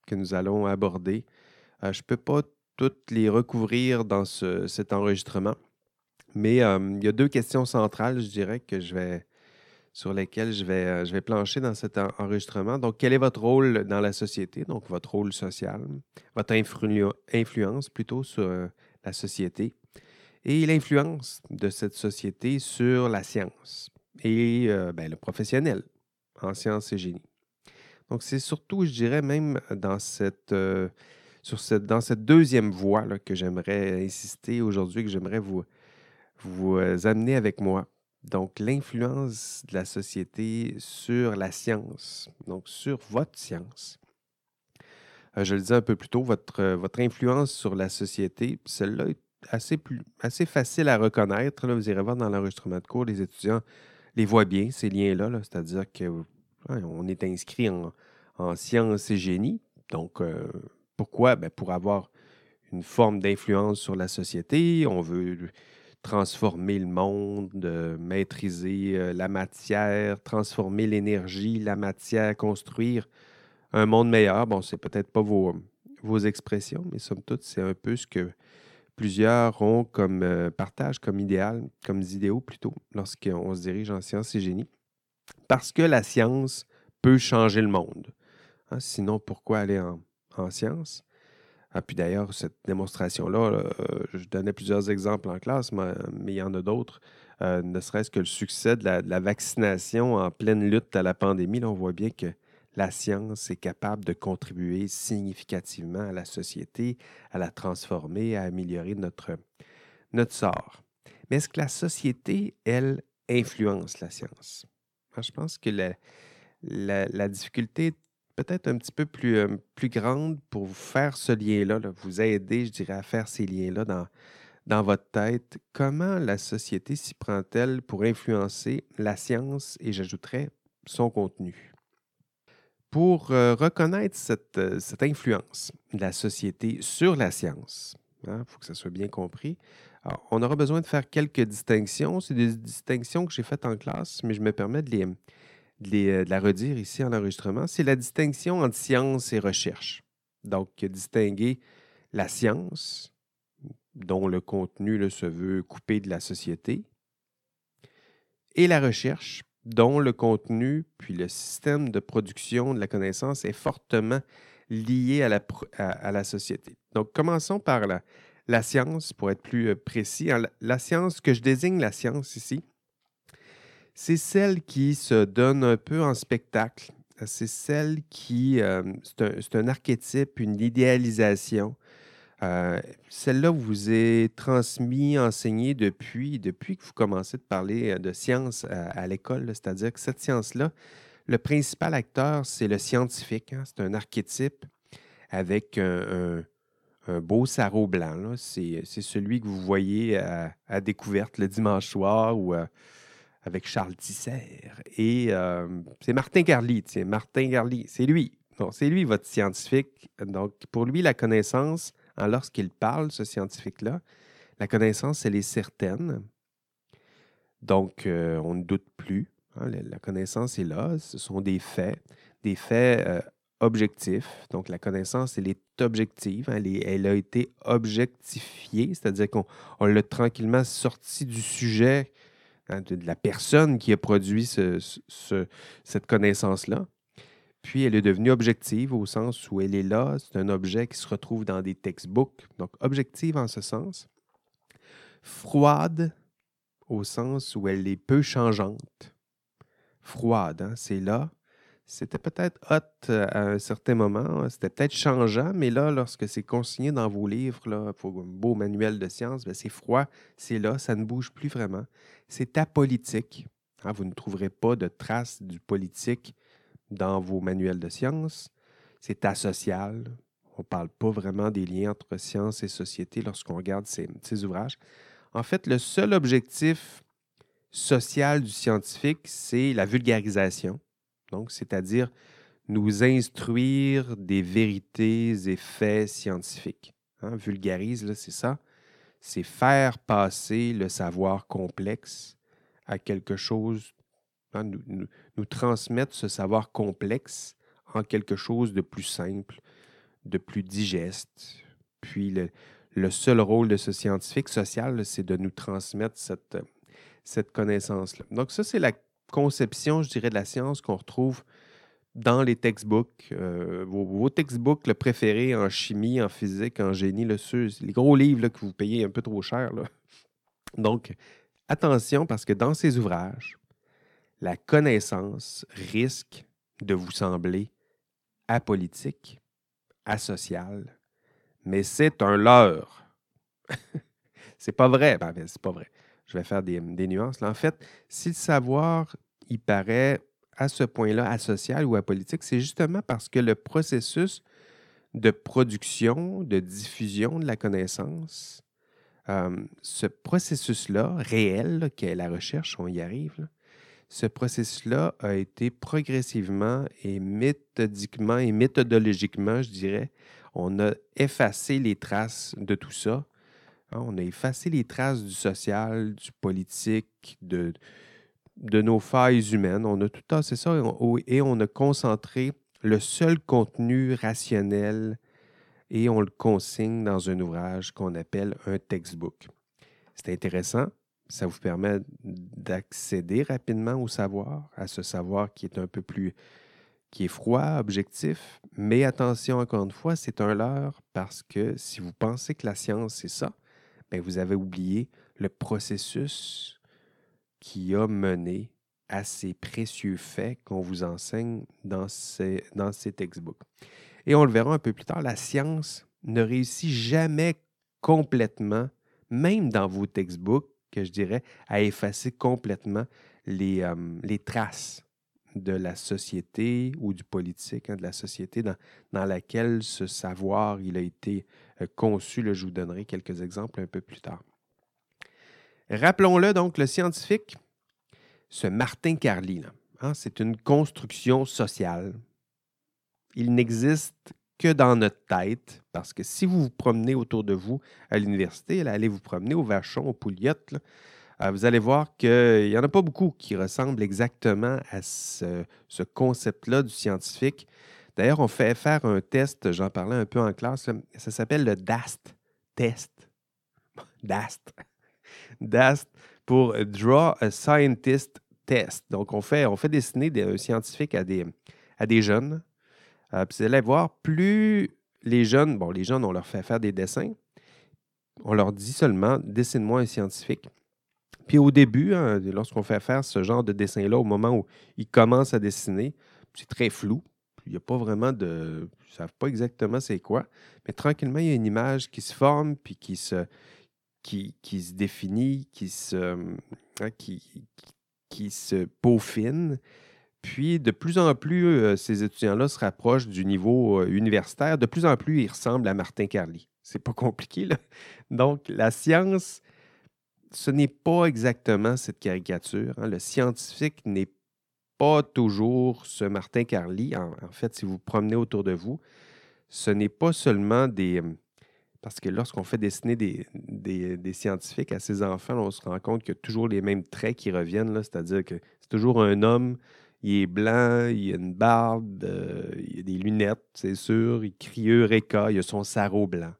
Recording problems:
none

